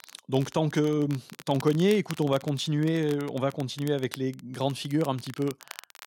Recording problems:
crackle, like an old record; noticeable; 20 dB below the speech

